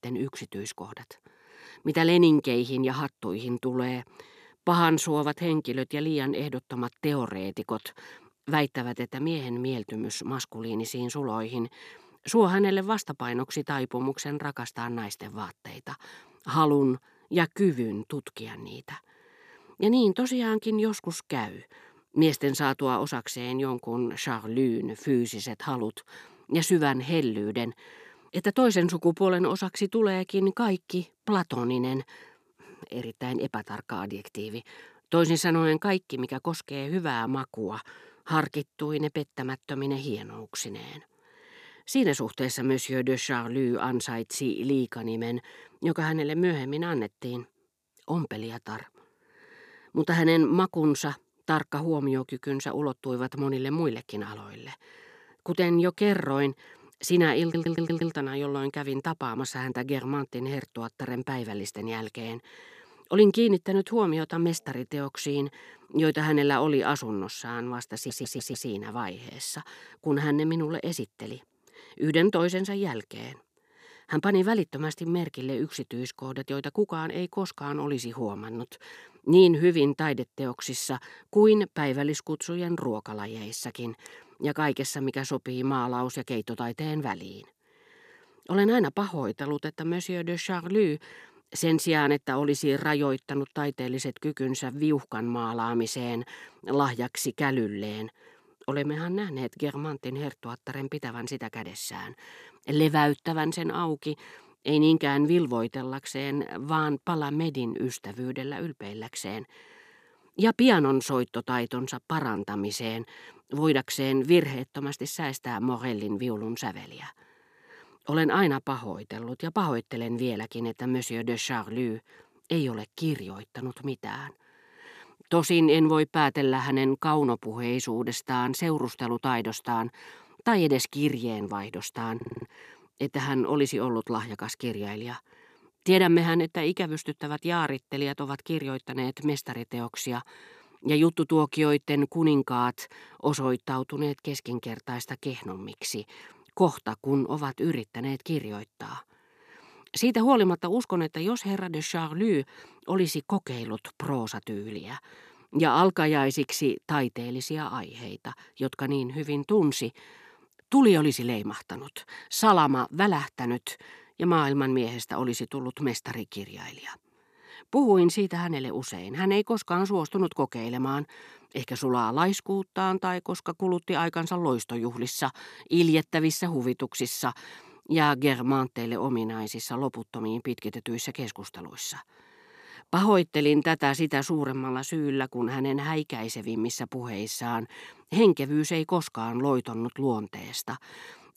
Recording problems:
audio stuttering; at 57 s, at 1:08 and at 2:12

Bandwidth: 14.5 kHz